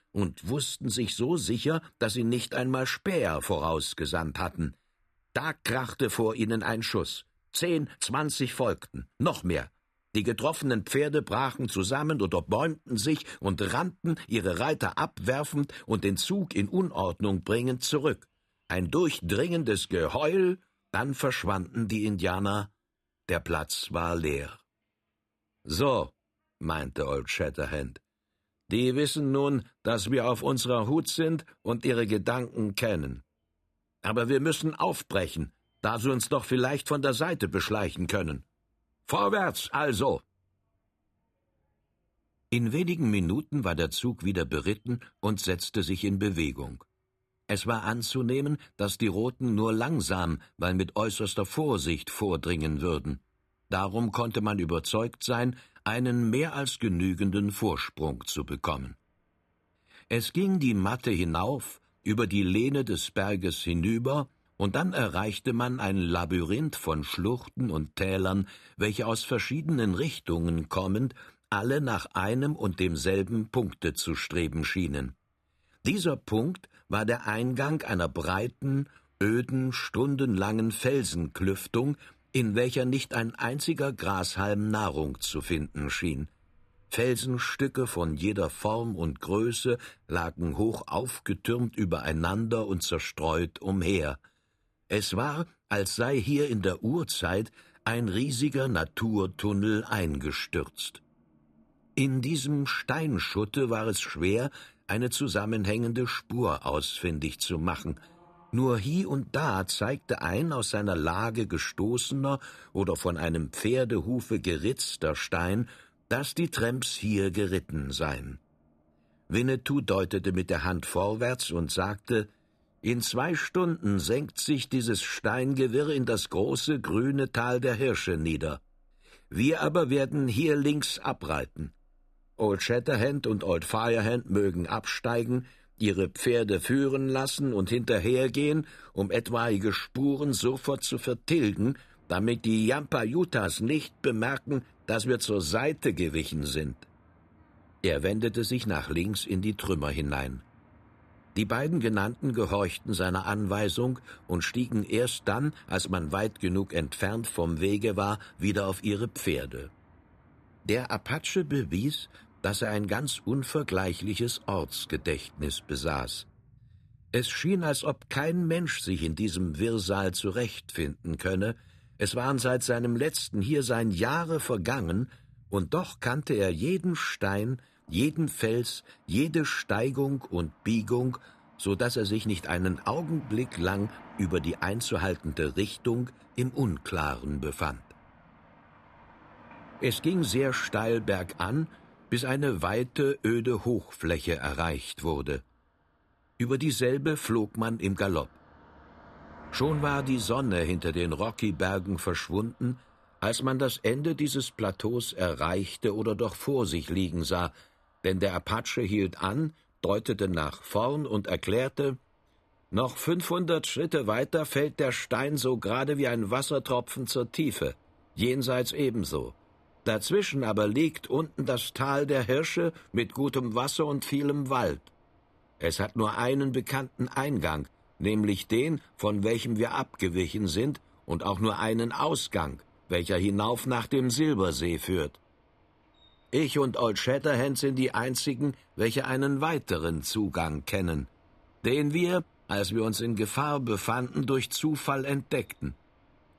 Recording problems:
traffic noise; faint; throughout; 30 dB below the speech

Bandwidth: 14 kHz